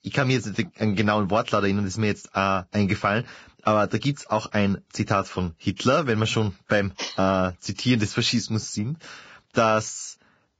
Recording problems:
garbled, watery; badly; nothing above 7.5 kHz

